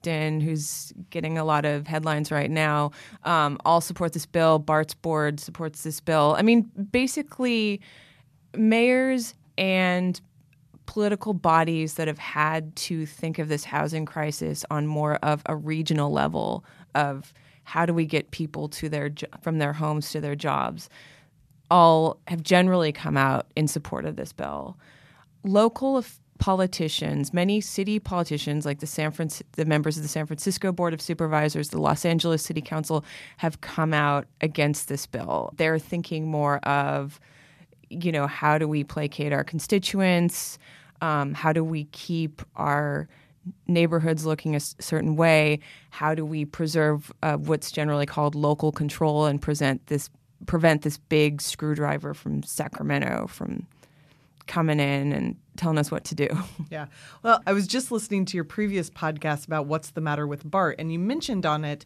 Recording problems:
none

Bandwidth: 14 kHz